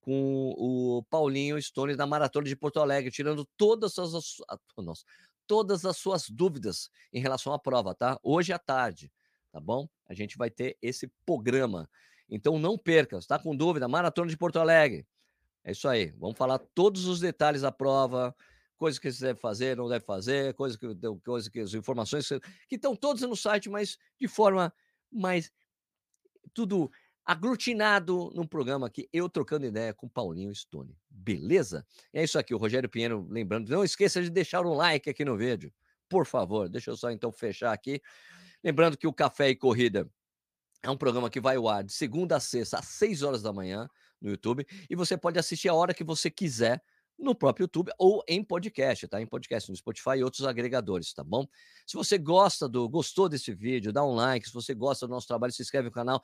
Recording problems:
none

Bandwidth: 15 kHz